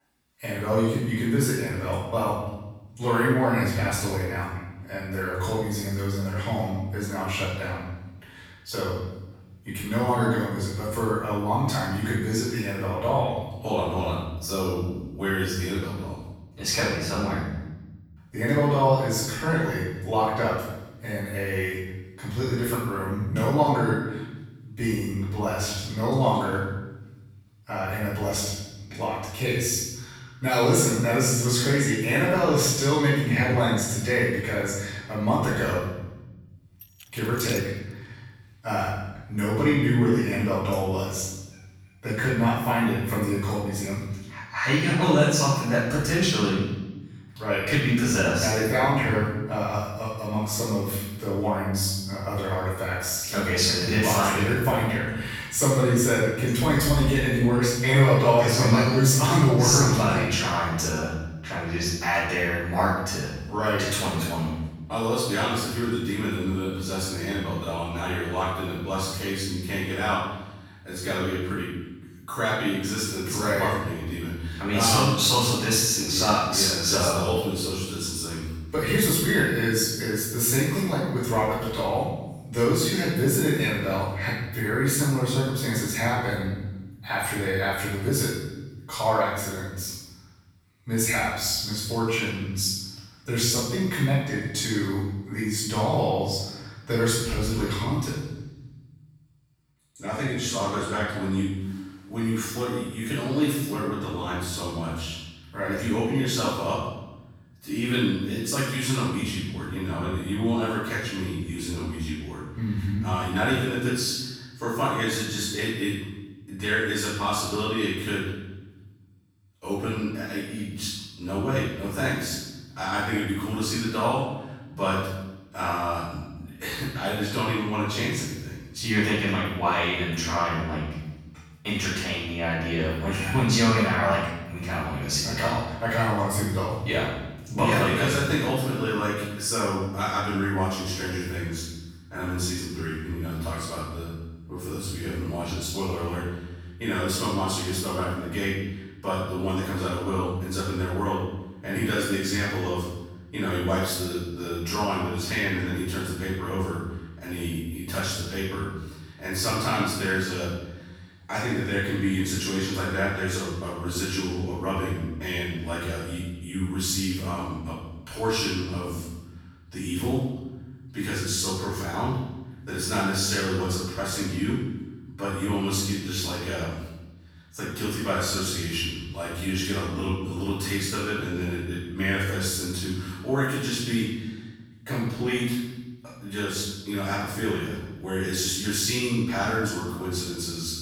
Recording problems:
room echo; strong; dies away in 1 s
off-mic speech; far
jangling keys; noticeable; at 37 s; peak 10 dB below the speech

